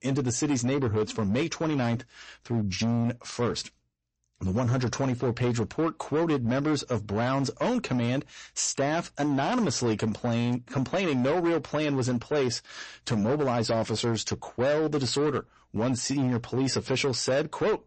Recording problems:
distortion; slight; 15% of the sound clipped
garbled, watery; slightly; nothing above 8 kHz

